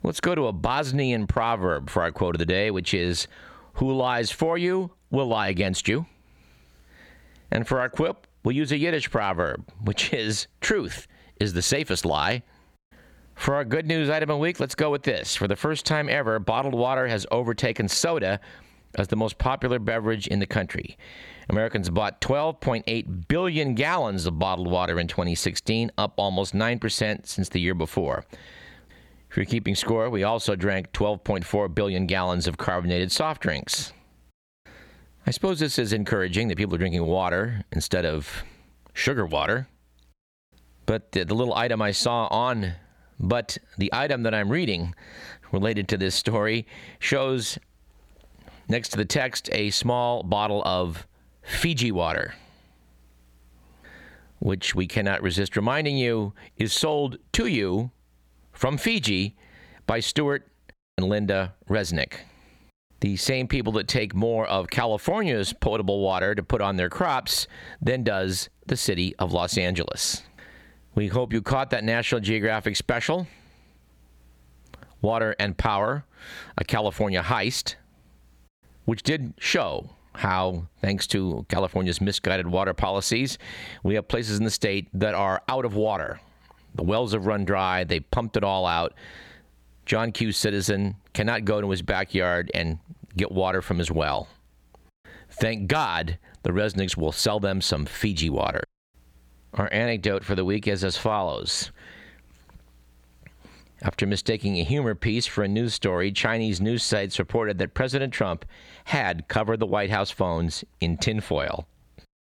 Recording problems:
squashed, flat; somewhat

